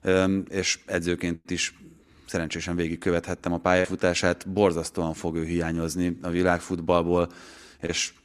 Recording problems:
none

